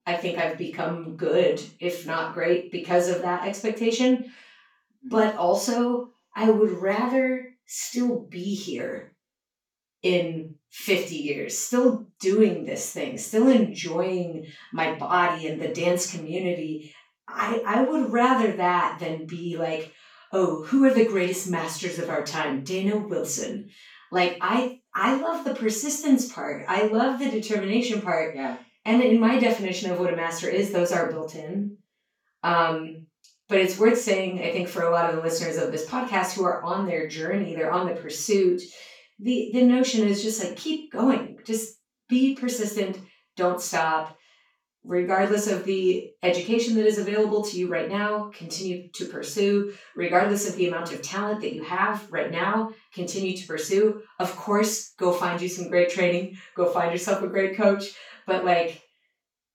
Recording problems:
off-mic speech; far
room echo; noticeable; dies away in 0.3 s

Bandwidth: 18 kHz